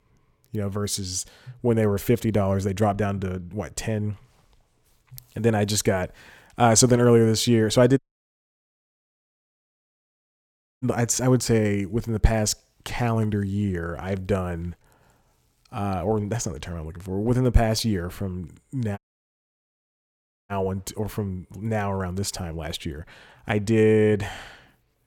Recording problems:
audio cutting out; at 8 s for 3 s and at 19 s for 1.5 s

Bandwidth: 17 kHz